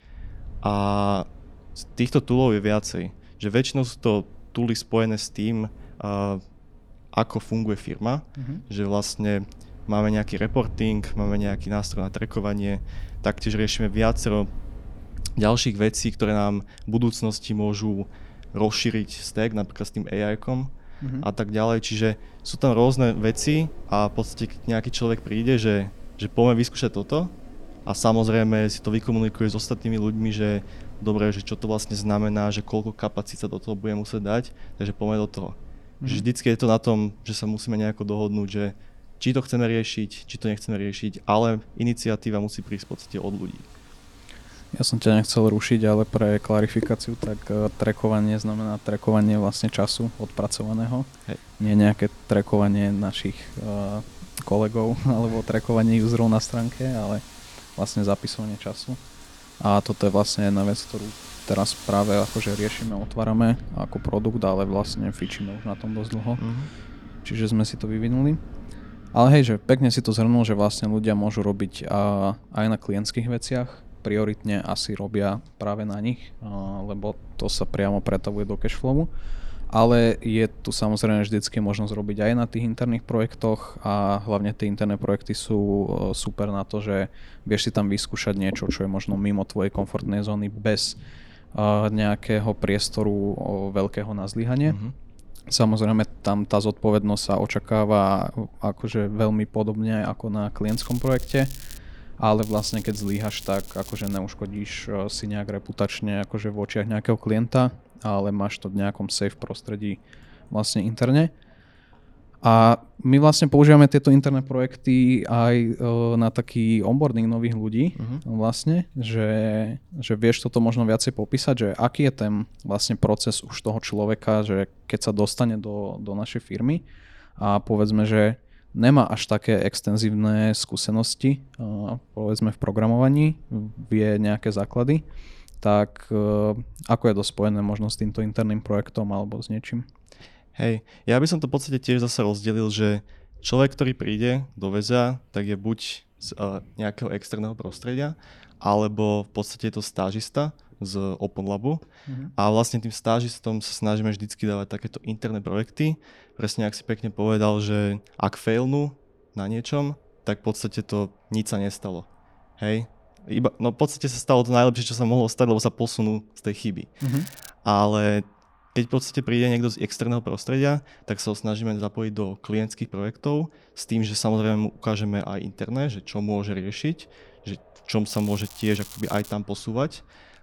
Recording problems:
crackling; noticeable; 4 times, first at 1:41; 15 dB below the speech
wind in the background; faint; throughout; 20 dB below the speech

